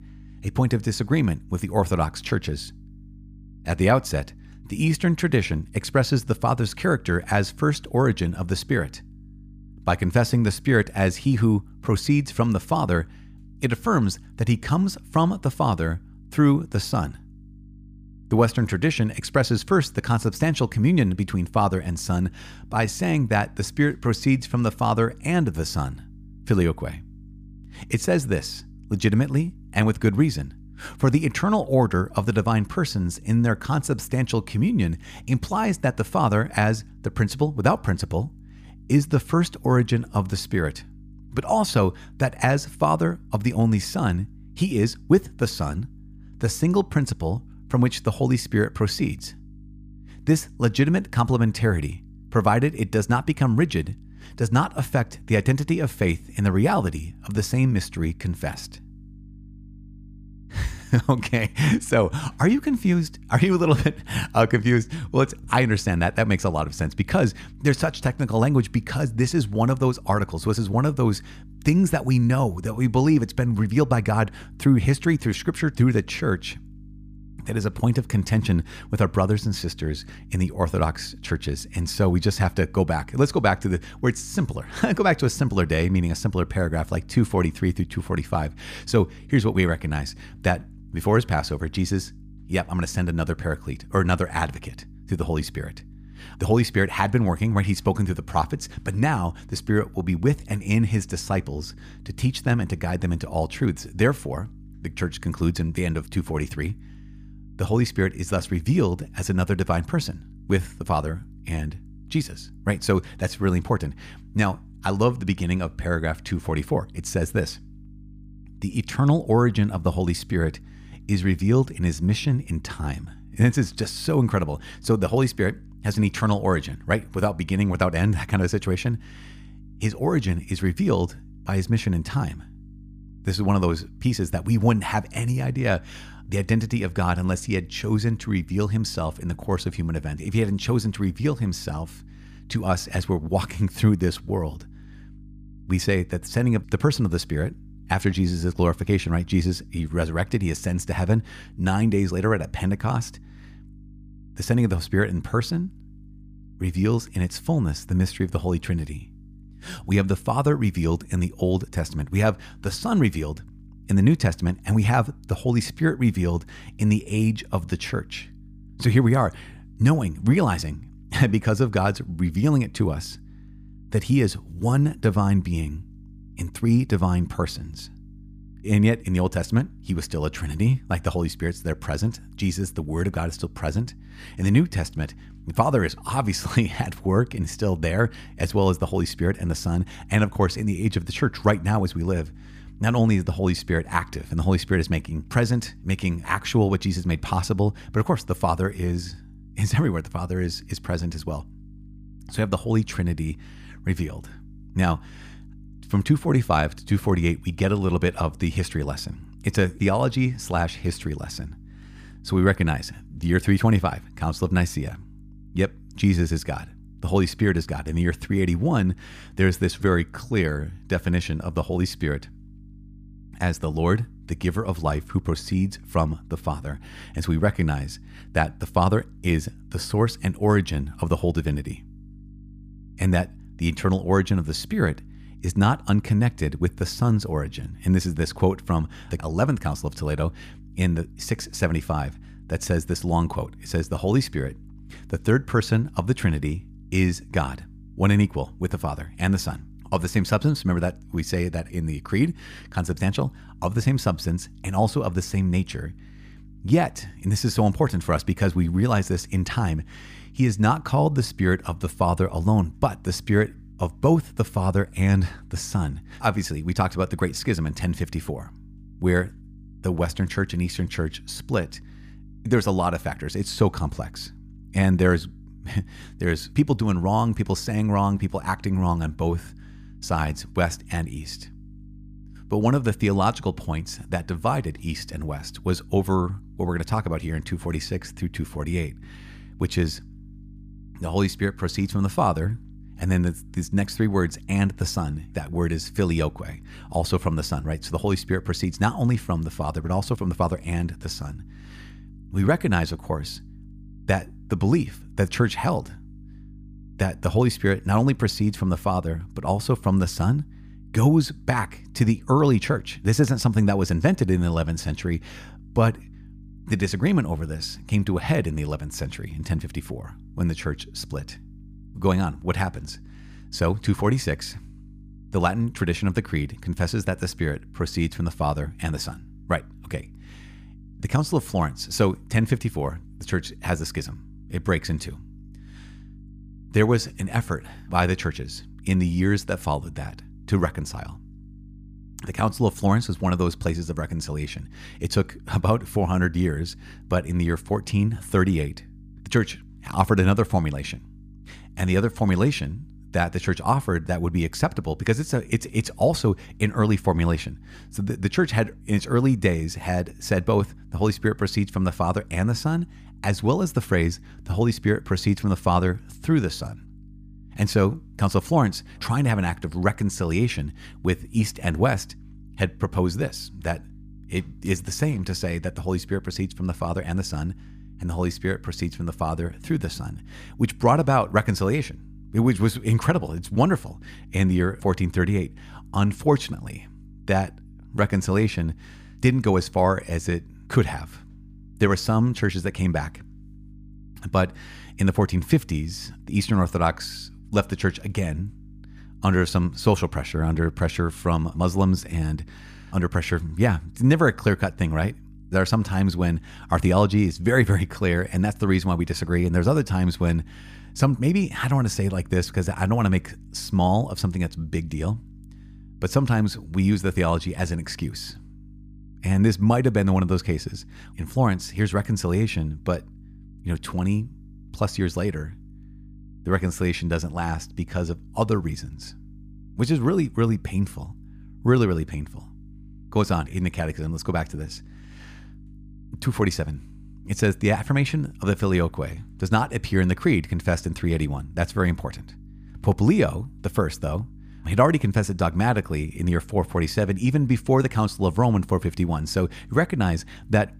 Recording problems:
electrical hum; faint; throughout; 50 Hz, 30 dB below the speech

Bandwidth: 15 kHz